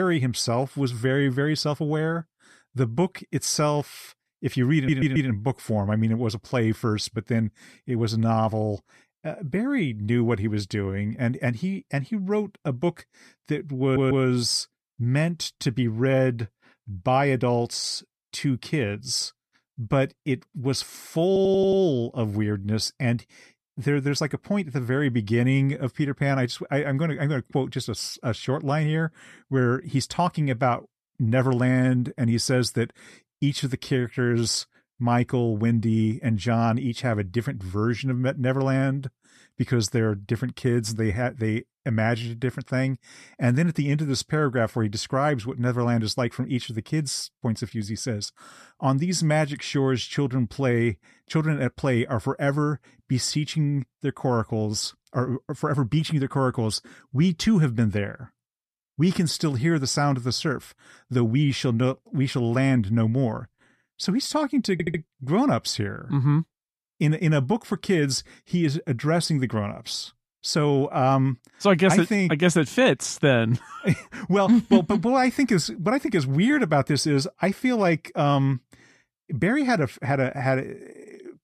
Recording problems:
abrupt cut into speech; at the start
audio stuttering; 4 times, first at 5 s

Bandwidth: 14 kHz